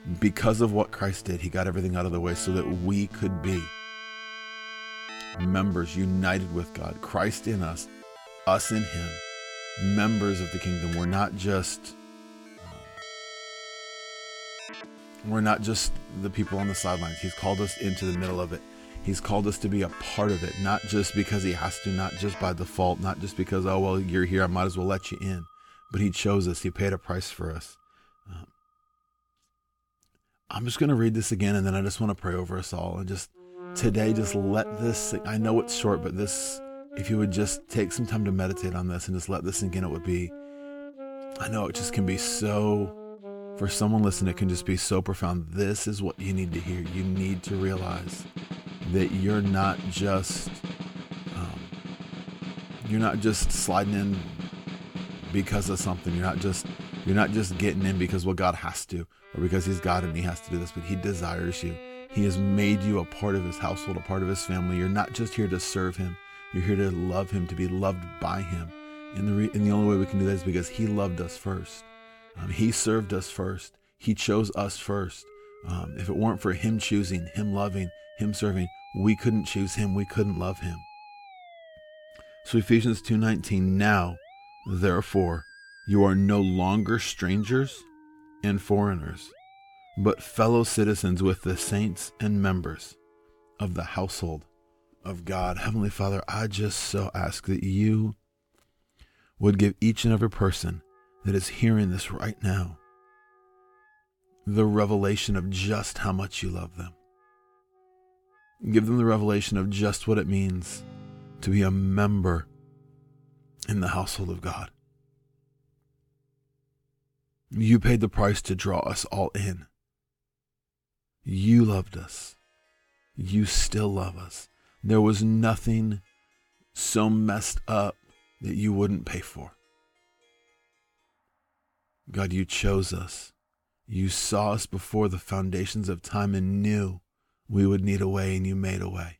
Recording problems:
background music; noticeable; throughout; 15 dB below the speech

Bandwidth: 17.5 kHz